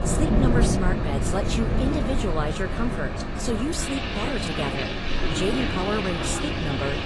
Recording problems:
garbled, watery; slightly; nothing above 10.5 kHz
rain or running water; very loud; throughout; 2 dB above the speech
wind noise on the microphone; occasional gusts; 10 dB below the speech

